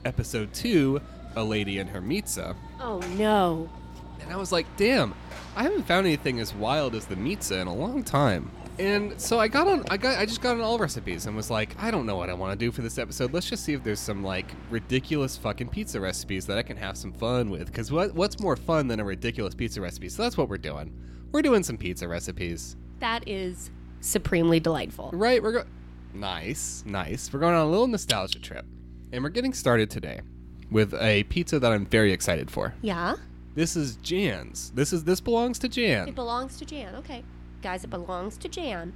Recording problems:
electrical hum; faint; throughout; 60 Hz, 30 dB below the speech
train or aircraft noise; faint; throughout; 20 dB below the speech

